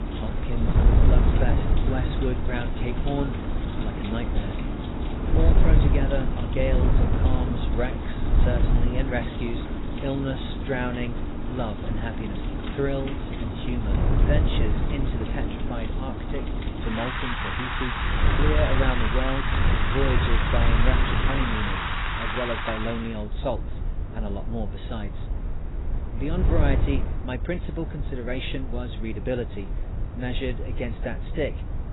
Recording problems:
garbled, watery; badly; nothing above 4 kHz
wind noise on the microphone; heavy; 5 dB below the speech
rain or running water; loud; until 23 s; 1 dB below the speech

